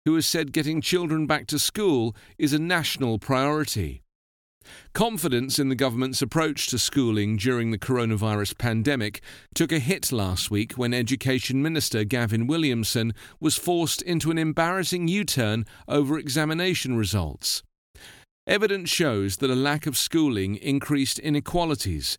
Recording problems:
none

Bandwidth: 18 kHz